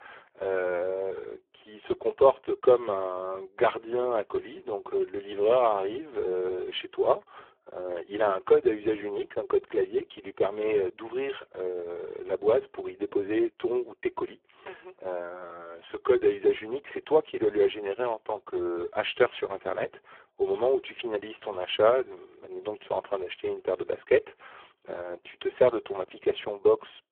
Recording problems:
phone-call audio; poor line

